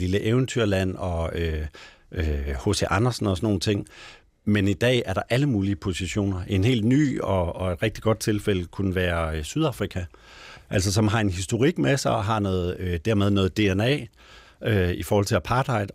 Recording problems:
abrupt cut into speech; at the start

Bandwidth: 15.5 kHz